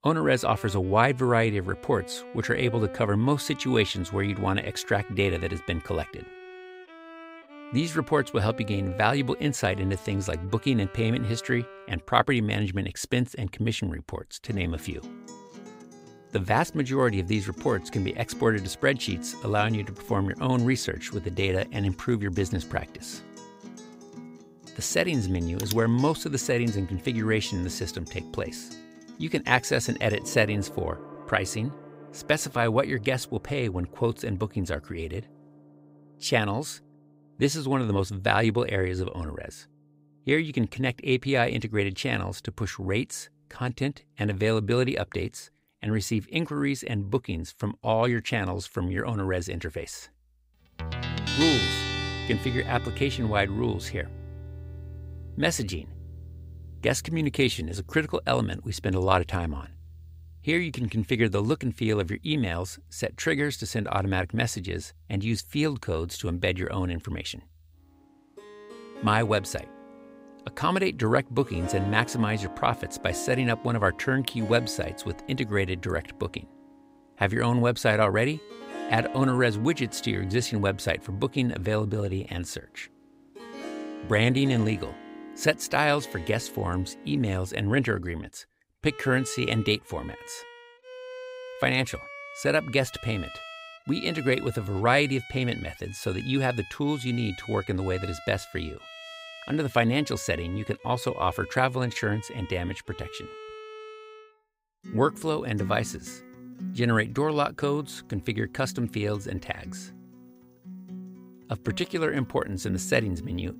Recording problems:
background music; noticeable; throughout; 15 dB below the speech

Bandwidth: 15.5 kHz